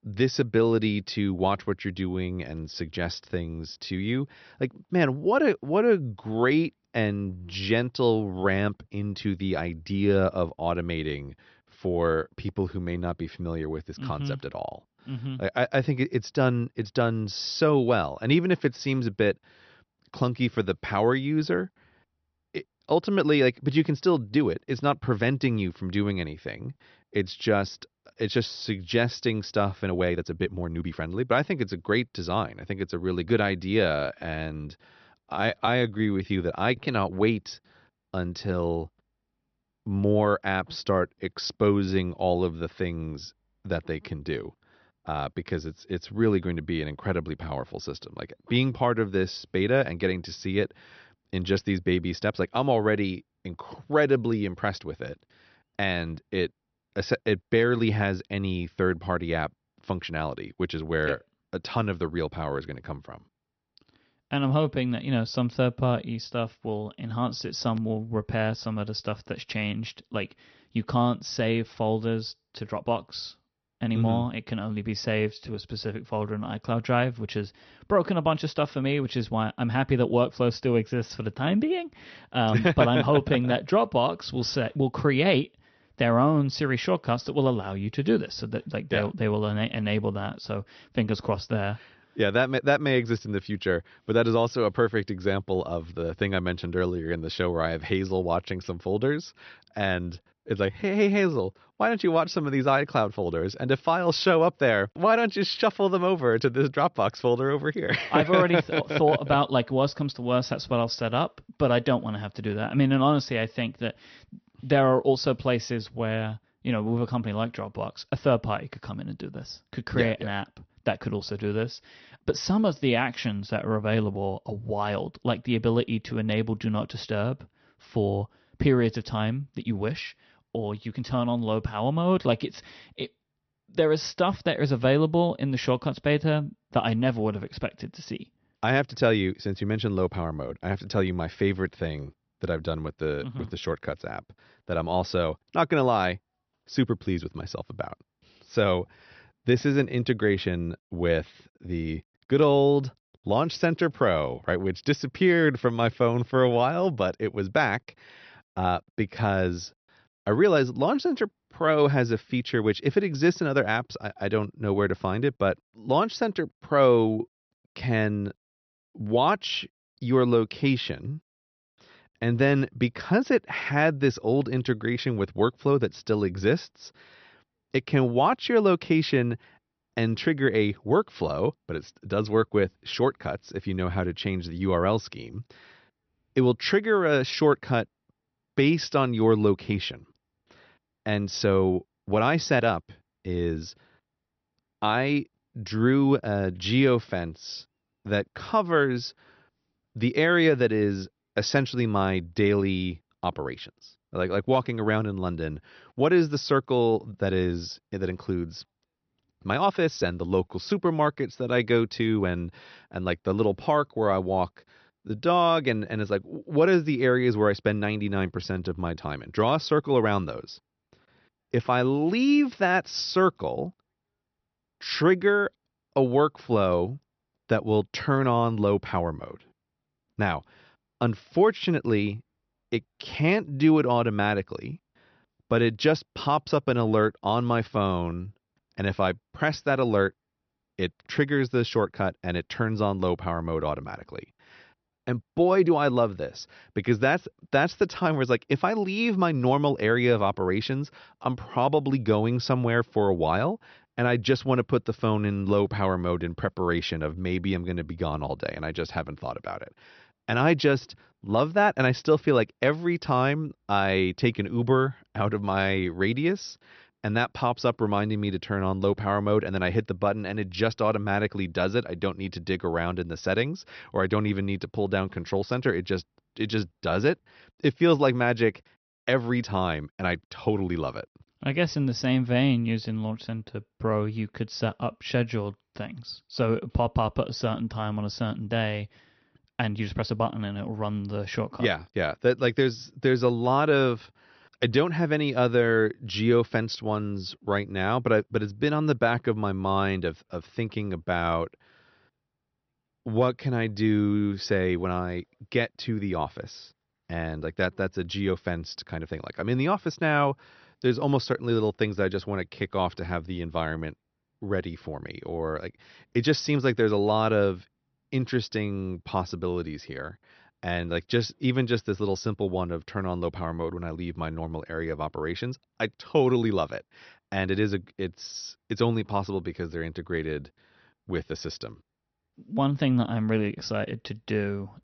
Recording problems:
high frequencies cut off; noticeable; nothing above 6 kHz
uneven, jittery; strongly; from 30 s to 5:21

